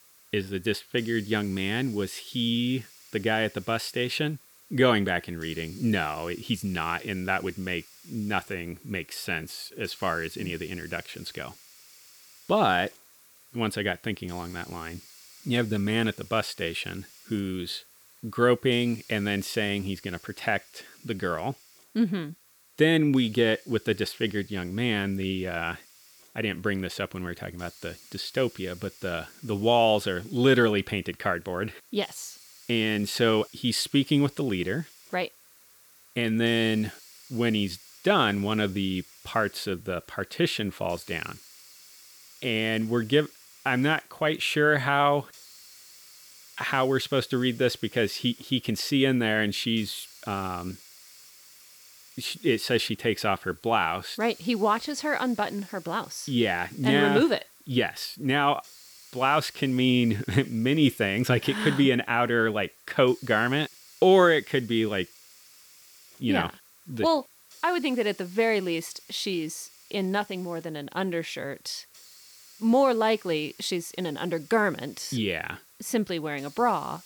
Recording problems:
hiss; faint; throughout; 25 dB below the speech

